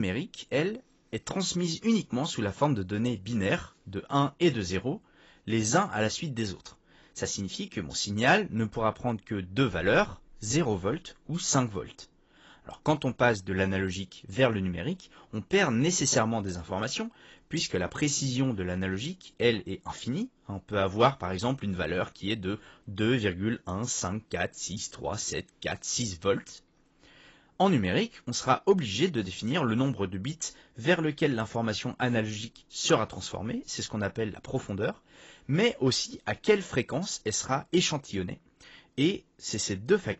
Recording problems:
garbled, watery; badly; nothing above 7.5 kHz
abrupt cut into speech; at the start

